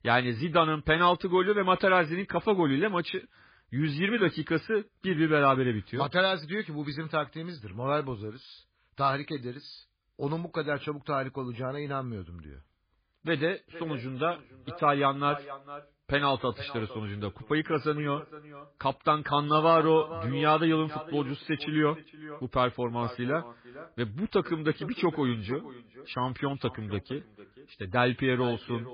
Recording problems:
garbled, watery; badly
echo of what is said; noticeable; from 13 s on; 460 ms later, 15 dB below the speech

